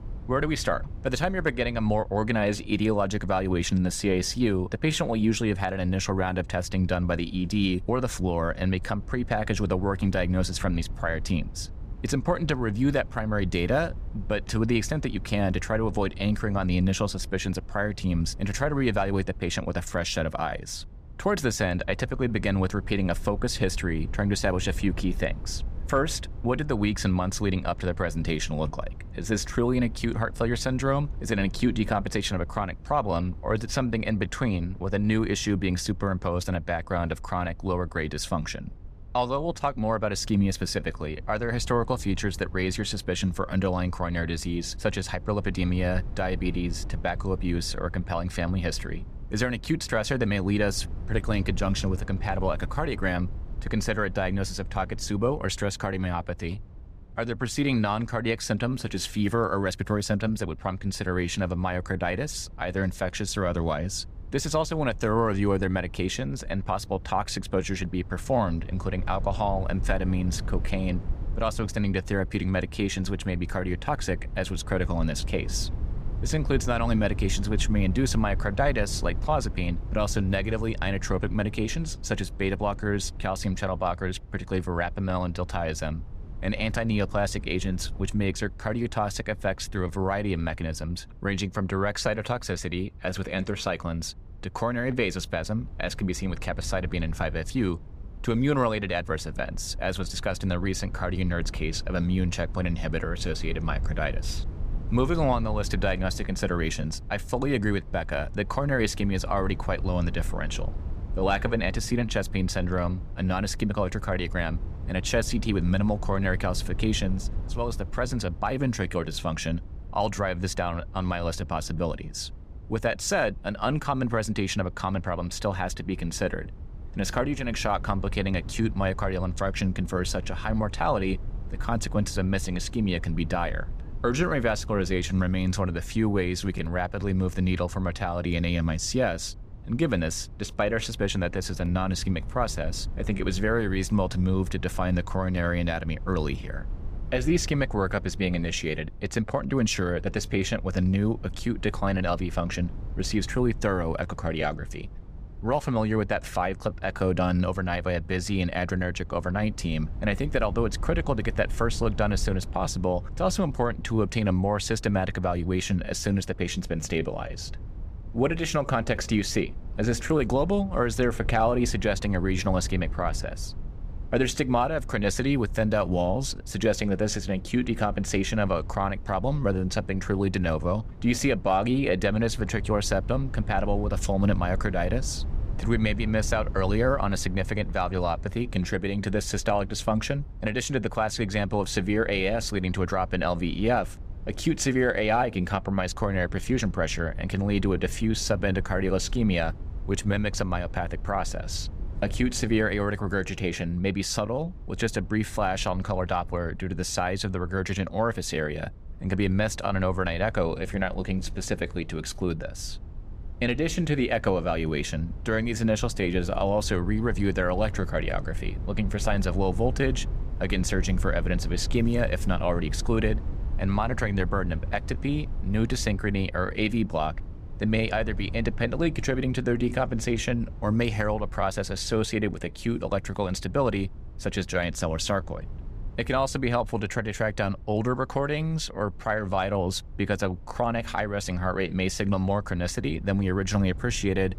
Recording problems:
low rumble; faint; throughout; 25 dB below the speech

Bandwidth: 15 kHz